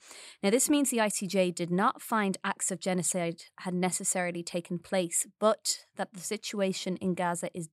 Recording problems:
none

